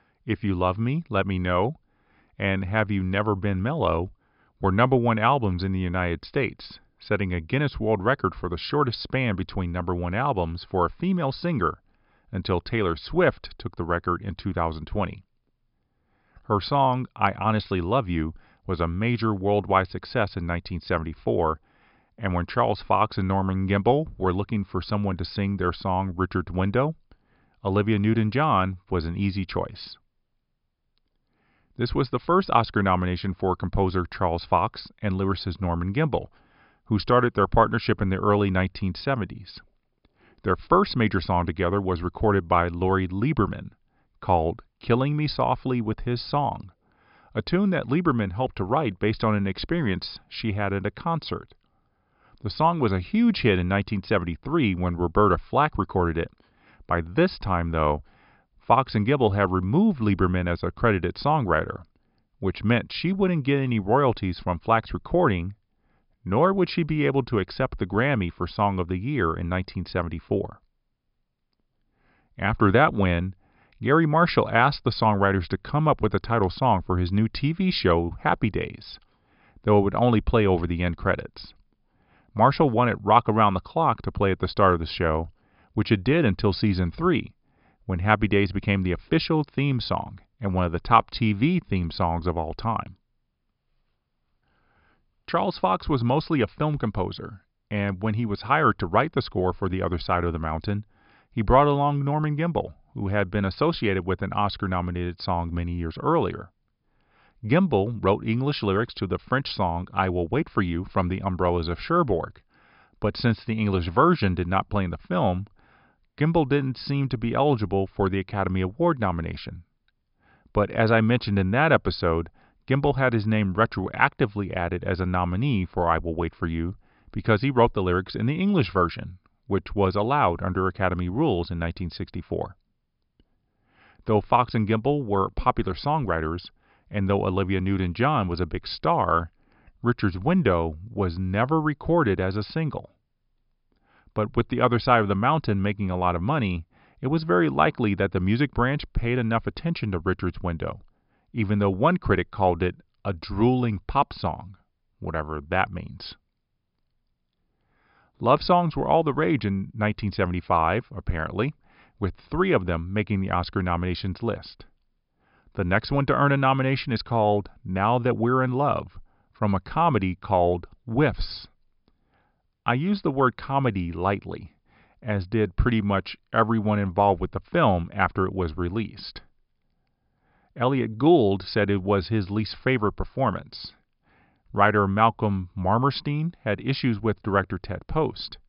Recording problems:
high frequencies cut off; noticeable; nothing above 5.5 kHz

